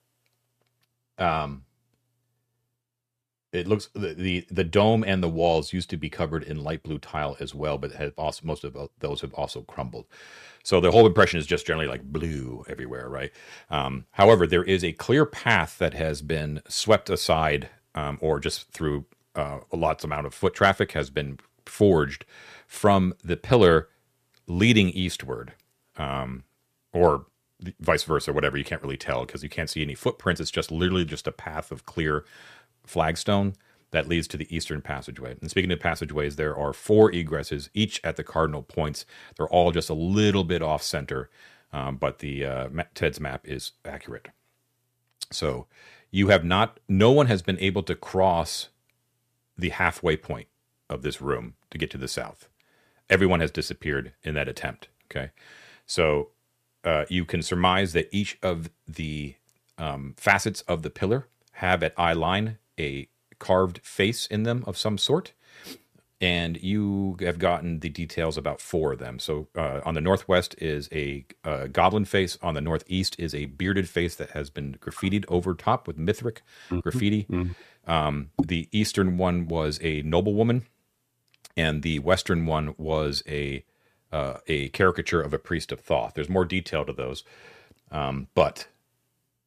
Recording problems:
none

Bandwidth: 14.5 kHz